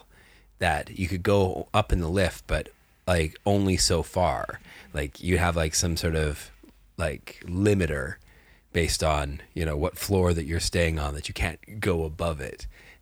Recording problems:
none

